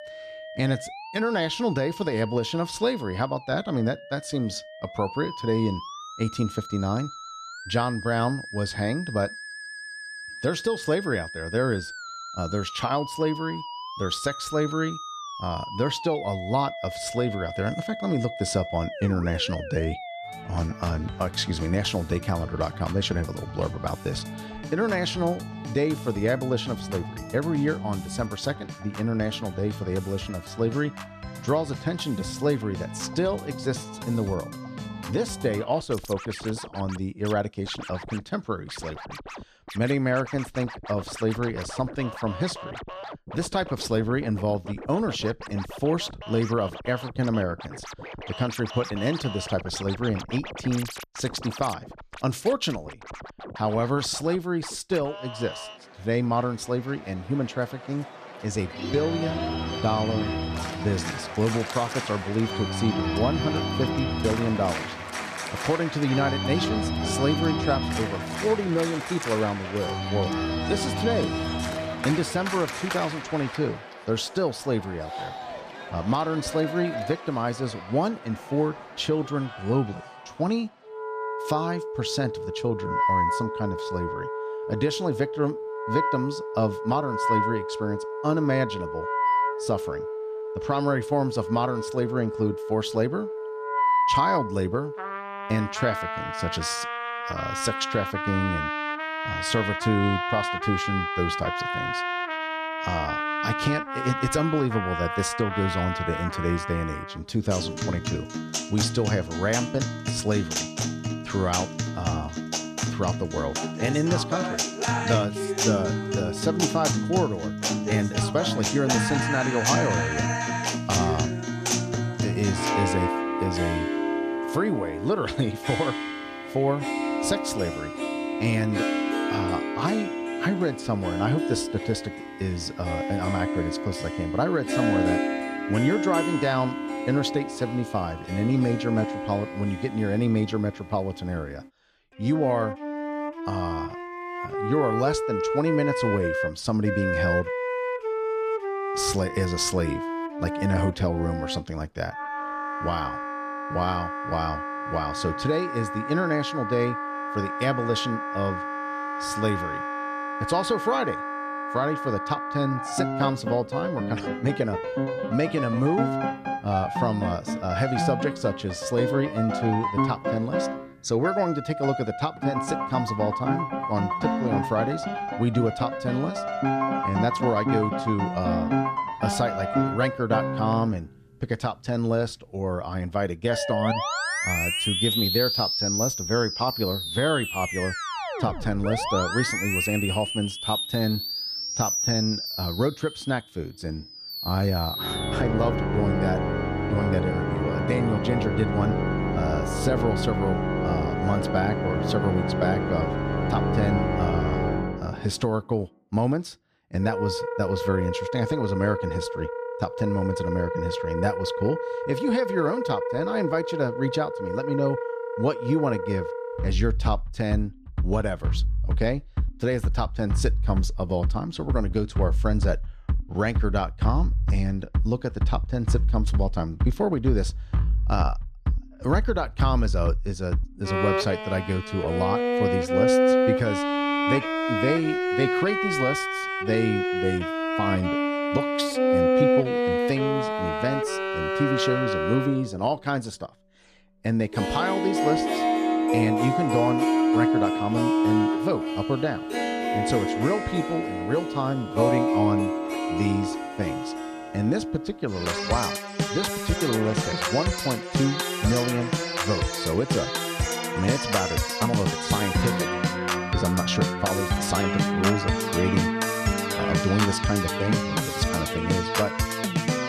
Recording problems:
background music; loud; throughout; 1 dB below the speech

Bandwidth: 14 kHz